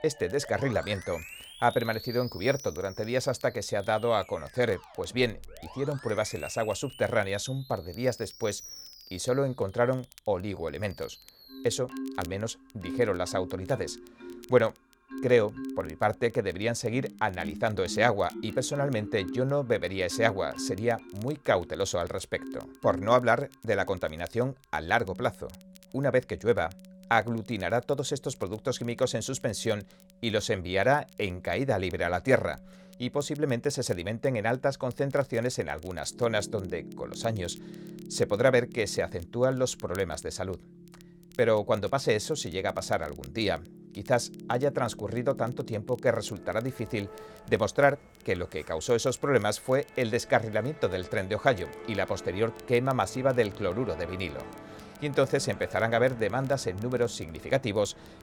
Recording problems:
background music; noticeable; throughout; 15 dB below the speech
crackle, like an old record; faint; 30 dB below the speech

